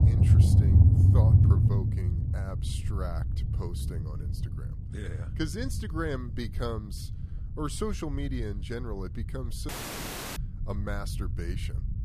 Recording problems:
low rumble; loud; throughout; as loud as the speech
audio cutting out; at 9.5 s for 0.5 s

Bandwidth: 14.5 kHz